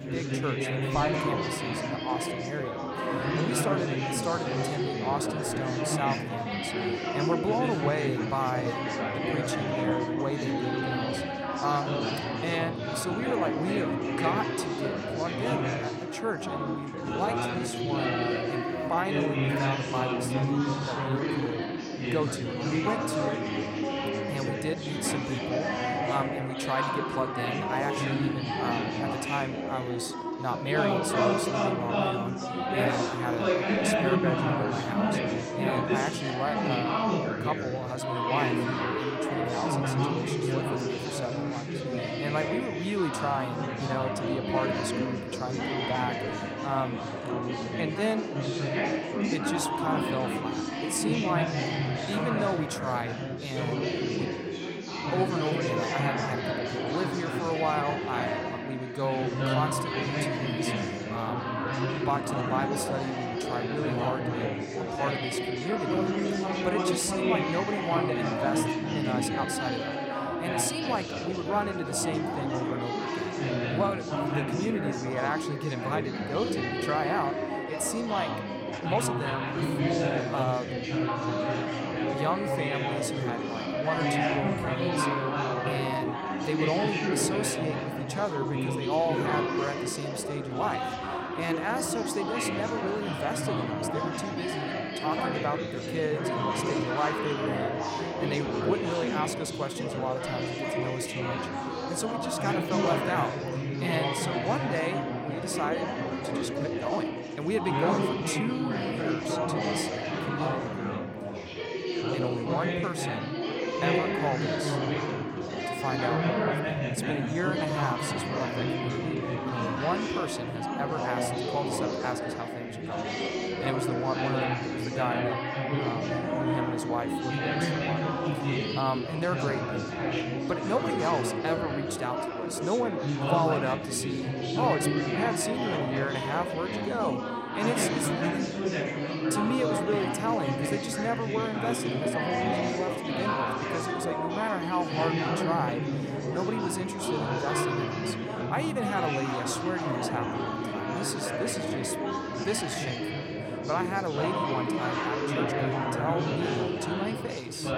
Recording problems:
chatter from many people; very loud; throughout; 3 dB above the speech
uneven, jittery; strongly; from 17 s to 2:33

